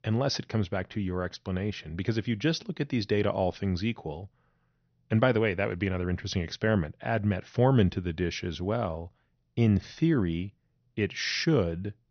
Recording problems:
high frequencies cut off; noticeable; nothing above 6 kHz

